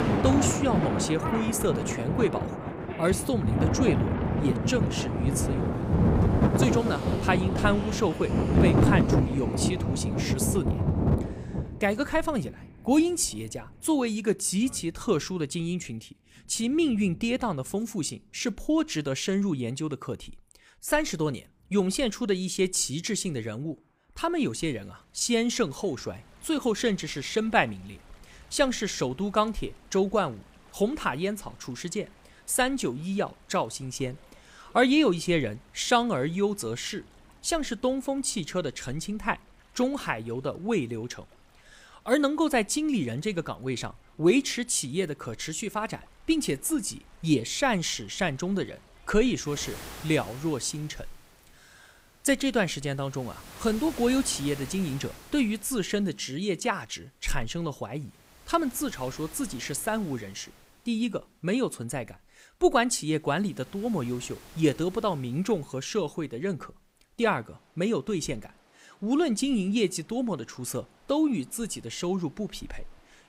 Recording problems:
rain or running water; very loud; throughout; 1 dB above the speech

